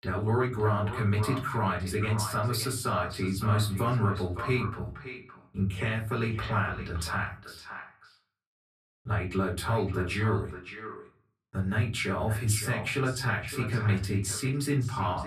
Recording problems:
echo of what is said; strong; throughout; 570 ms later, 10 dB below the speech
off-mic speech; far
room echo; very slight; dies away in 0.3 s

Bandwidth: 14.5 kHz